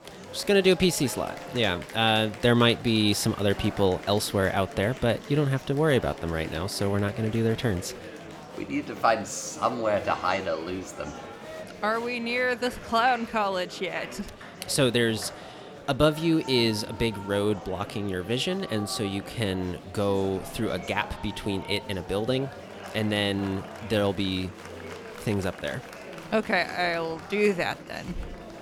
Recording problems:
murmuring crowd; noticeable; throughout; 15 dB below the speech

